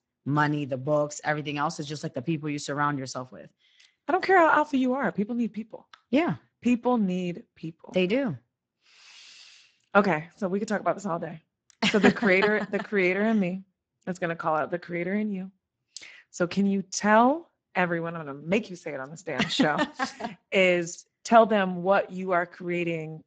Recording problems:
garbled, watery; badly; nothing above 7.5 kHz

